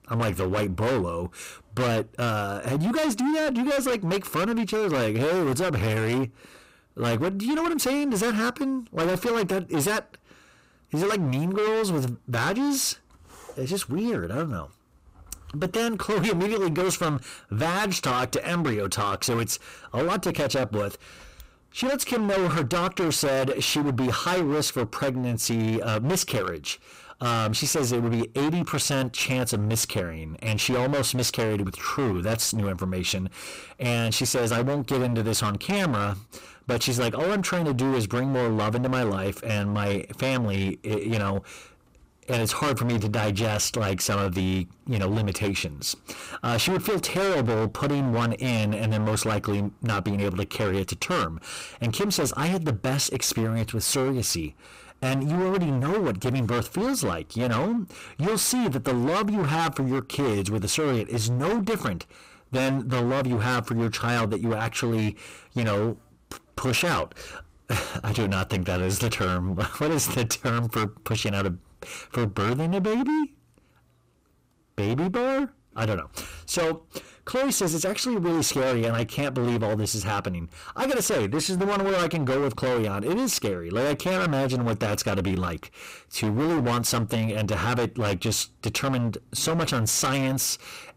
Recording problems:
distortion; heavy; 26% of the sound clipped

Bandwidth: 15.5 kHz